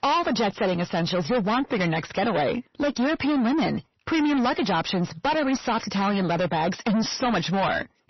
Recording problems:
distortion; heavy; 6 dB below the speech
garbled, watery; slightly; nothing above 6 kHz

